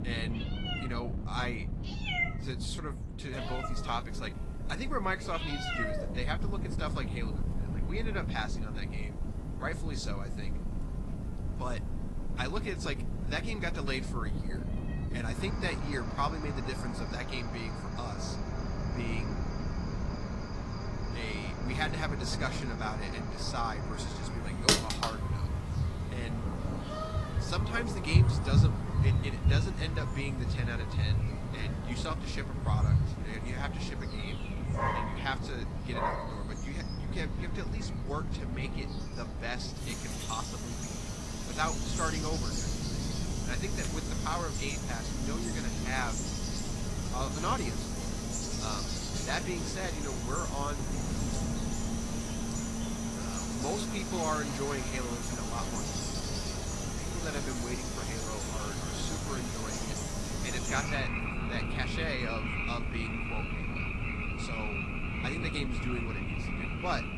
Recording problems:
garbled, watery; slightly
animal sounds; very loud; throughout; 3 dB above the speech
wind noise on the microphone; occasional gusts; 10 dB below the speech

